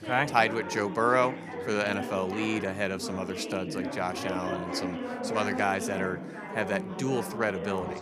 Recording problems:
background chatter; loud; throughout; 4 voices, 6 dB below the speech

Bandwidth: 14.5 kHz